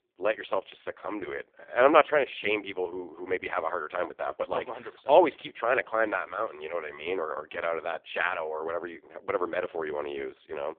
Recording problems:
phone-call audio; poor line; nothing above 3.5 kHz

